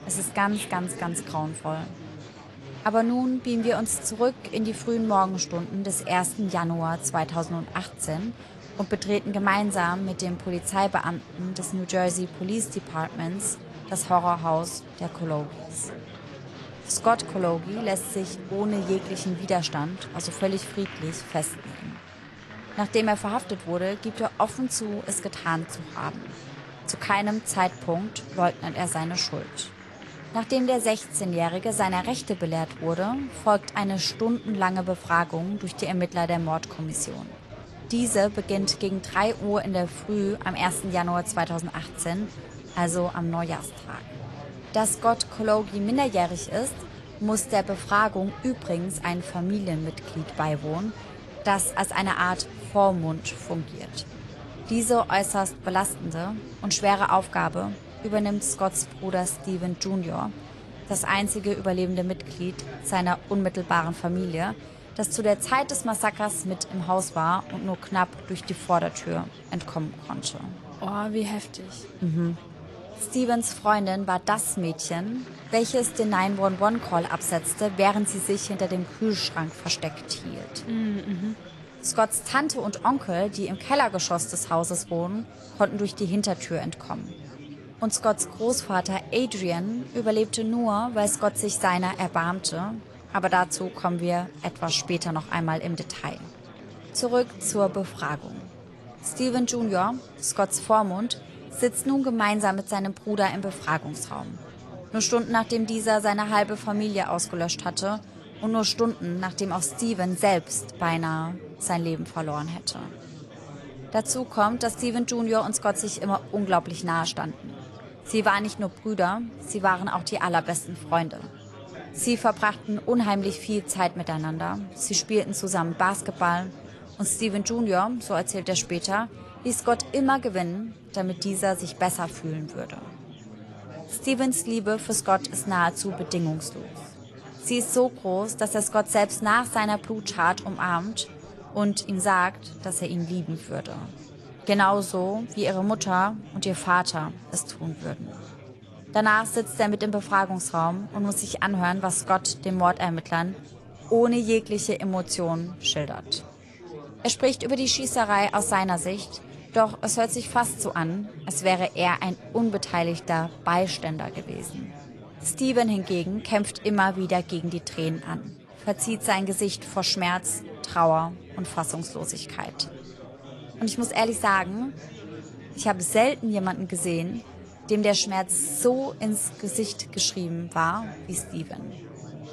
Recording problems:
garbled, watery; slightly; nothing above 11.5 kHz
murmuring crowd; noticeable; throughout; 15 dB below the speech

